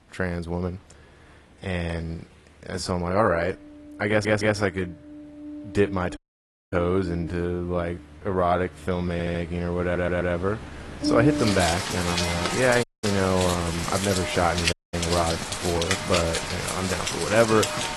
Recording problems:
garbled, watery; slightly
rain or running water; loud; throughout; 3 dB below the speech
uneven, jittery; strongly; from 1.5 to 14 s
audio stuttering; at 4 s, at 9 s and at 10 s
audio cutting out; at 6 s for 0.5 s, at 13 s and at 15 s

